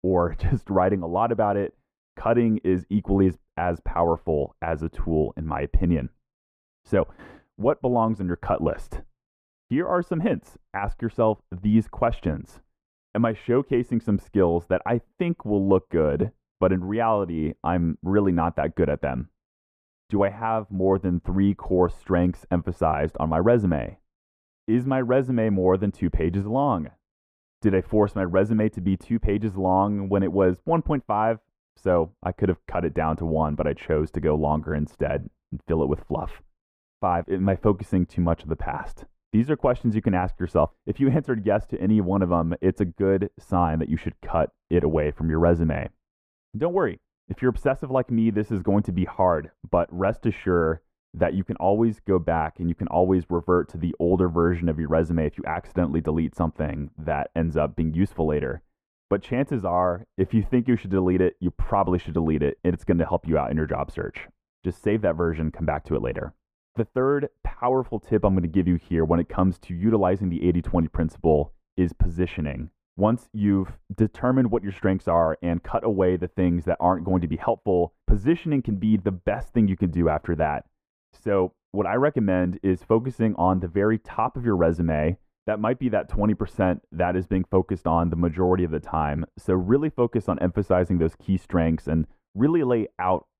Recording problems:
muffled; very; fading above 2.5 kHz

